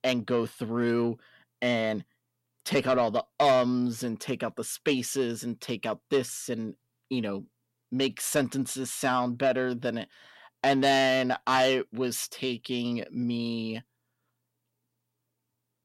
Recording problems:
distortion; slight; 10 dB below the speech

